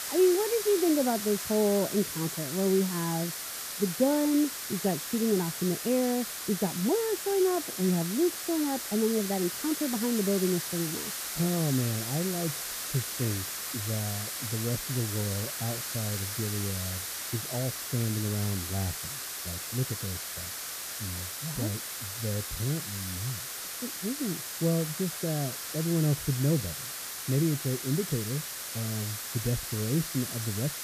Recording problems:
muffled; very; fading above 1 kHz
hiss; loud; throughout; 3 dB below the speech

